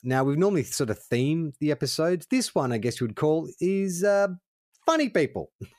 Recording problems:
none

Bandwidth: 14.5 kHz